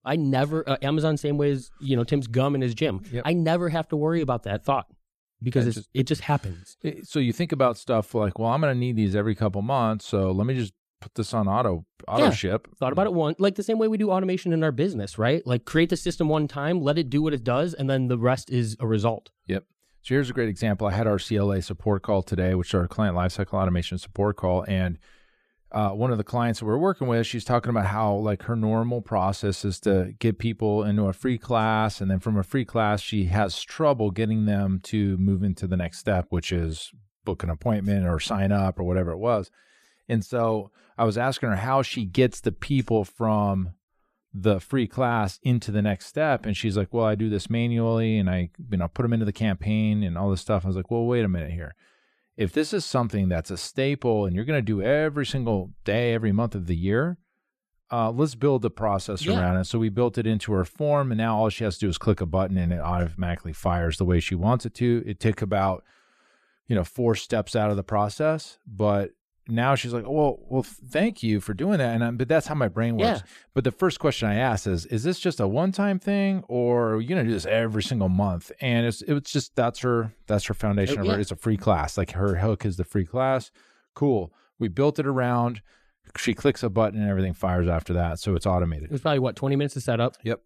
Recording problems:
none

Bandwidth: 14 kHz